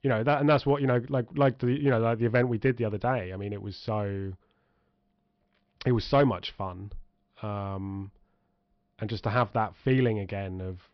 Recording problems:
high frequencies cut off; noticeable; nothing above 5.5 kHz

